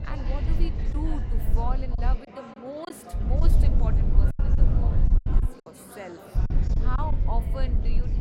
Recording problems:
chatter from many people; loud; throughout; 6 dB below the speech
low rumble; loud; until 2 s, from 3 to 5.5 s and from 6.5 s on; 4 dB below the speech
choppy; very; from 1 to 3.5 s and from 4.5 to 5.5 s; 9% of the speech affected

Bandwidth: 16.5 kHz